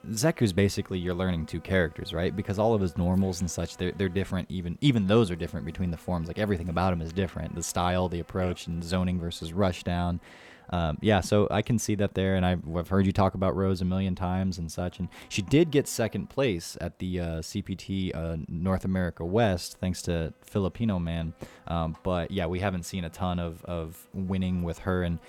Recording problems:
electrical hum; faint; throughout; 60 Hz, 25 dB below the speech

